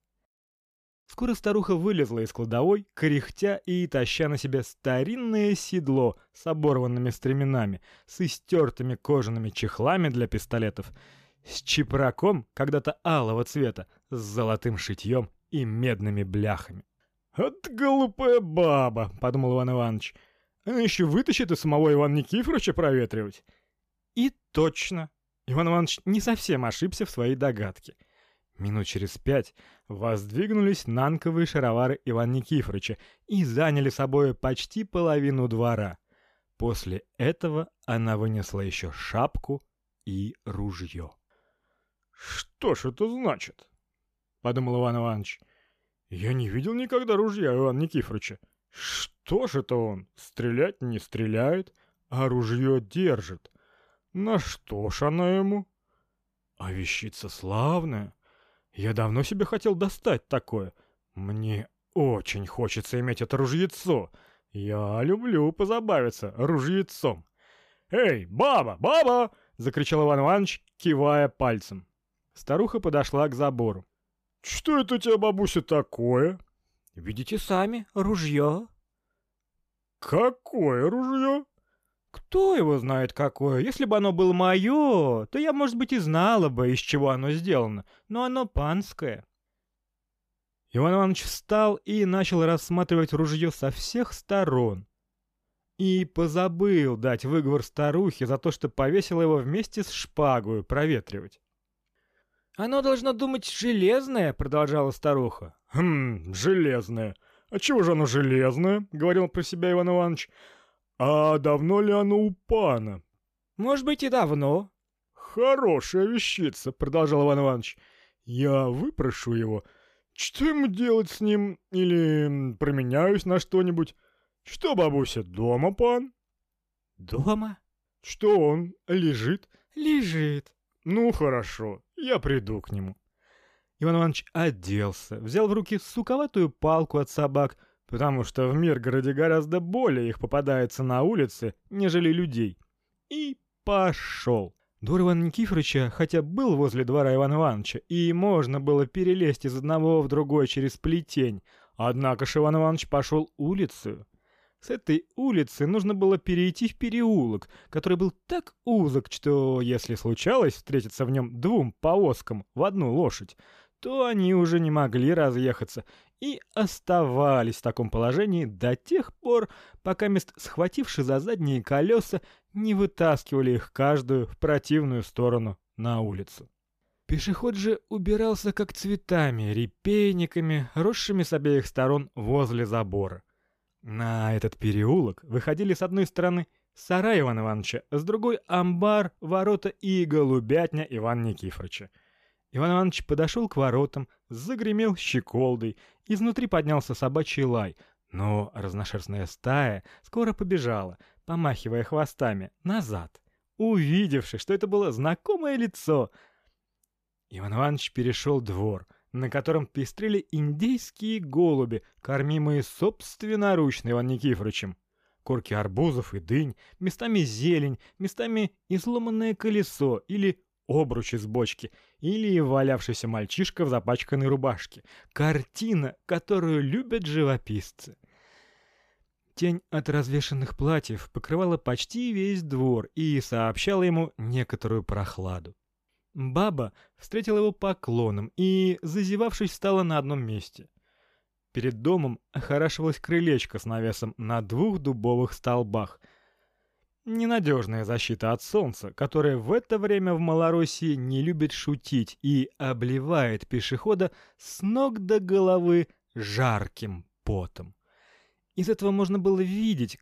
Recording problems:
none

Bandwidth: 14.5 kHz